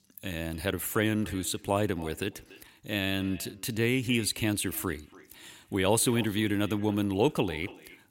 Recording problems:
echo of what is said; faint; throughout; 290 ms later, 20 dB below the speech

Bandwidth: 16 kHz